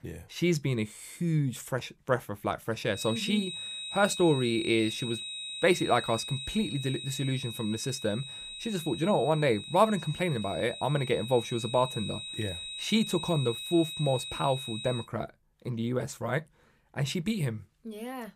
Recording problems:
high-pitched whine; loud; from 3 to 15 s; 4 kHz, 7 dB below the speech

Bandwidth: 15 kHz